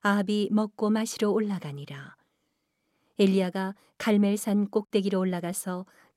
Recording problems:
none

